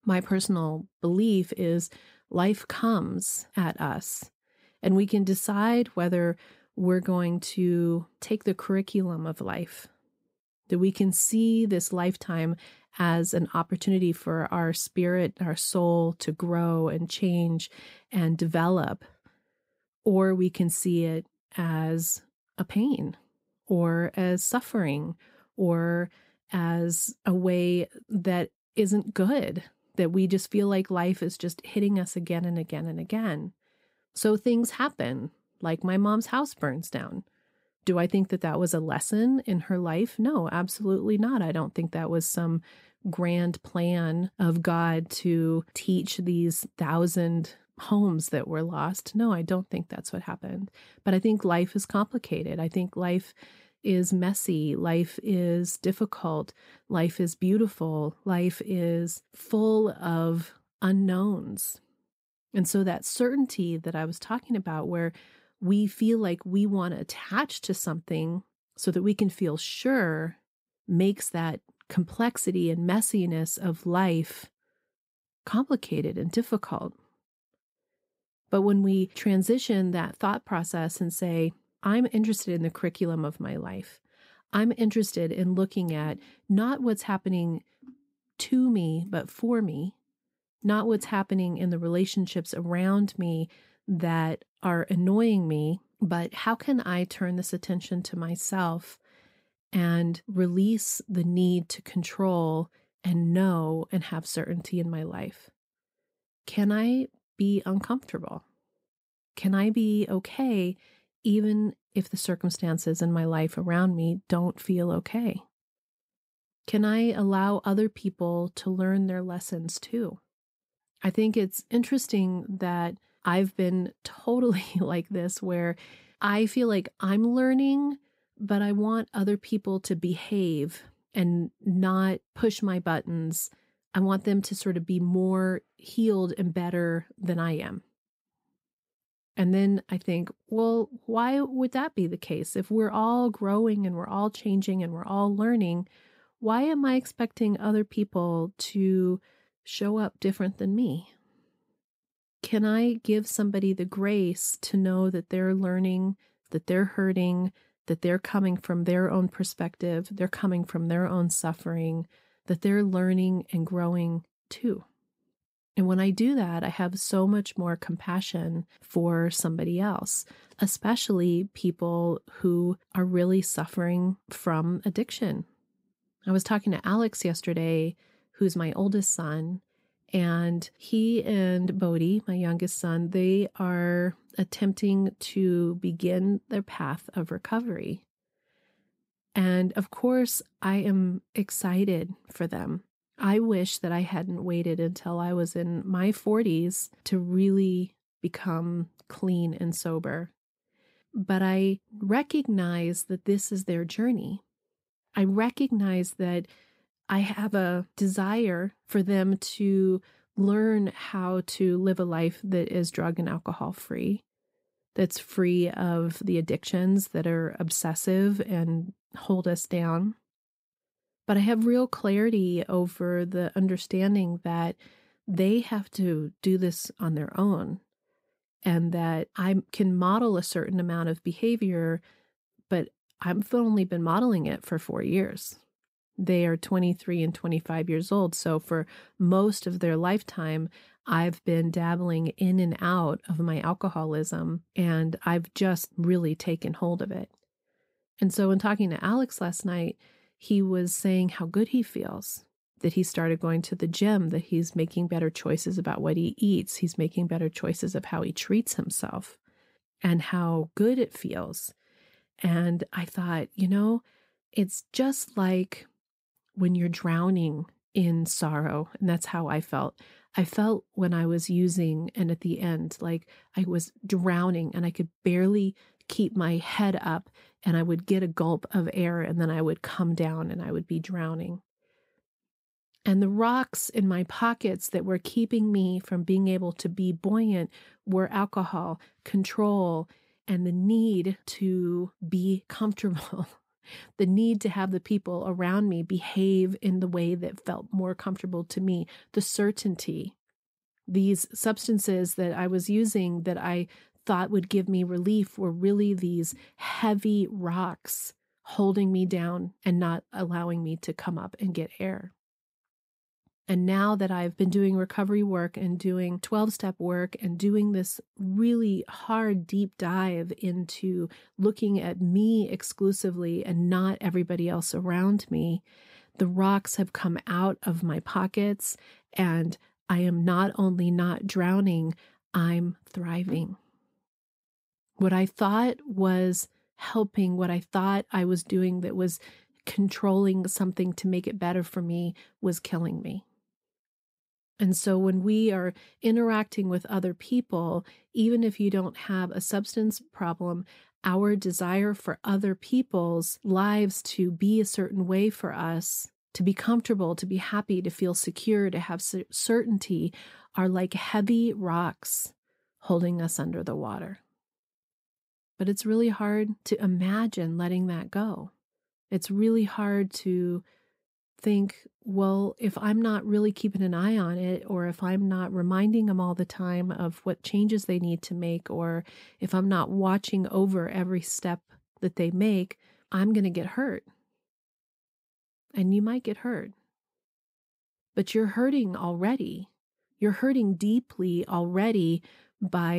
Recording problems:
abrupt cut into speech; at the end

